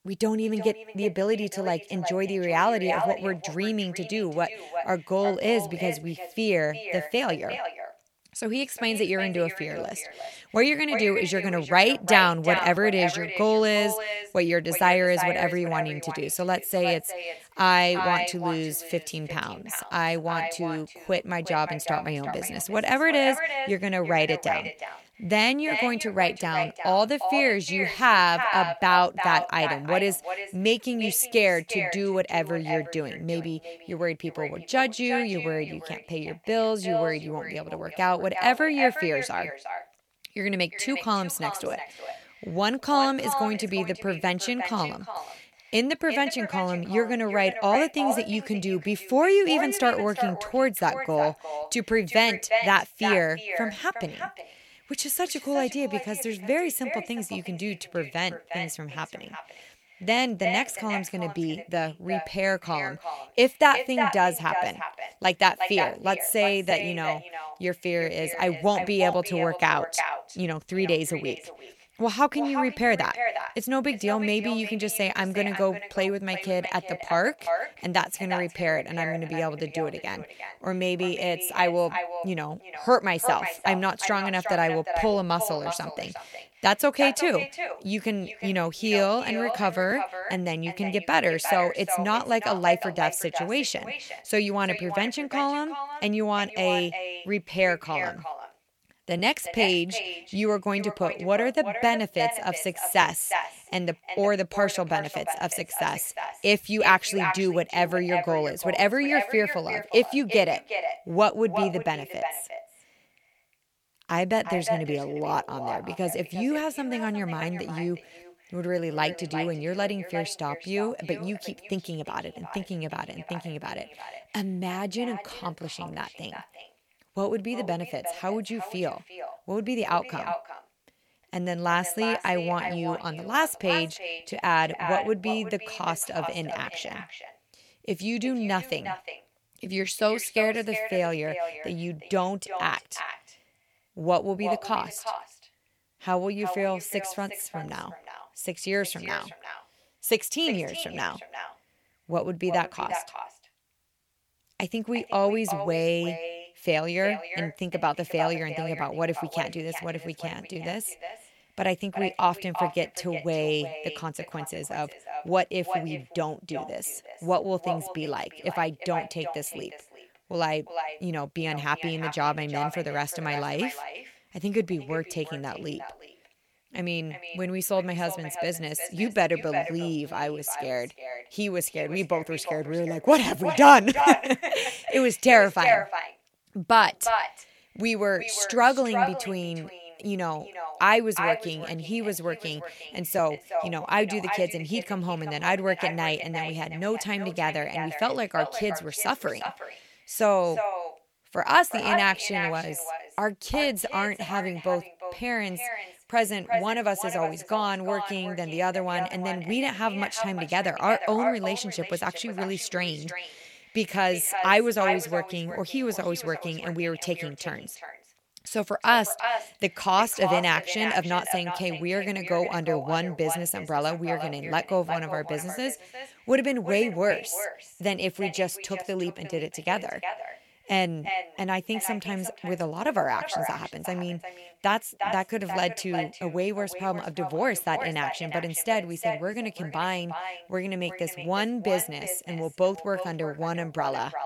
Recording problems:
echo of what is said; strong; throughout; 360 ms later, 7 dB below the speech

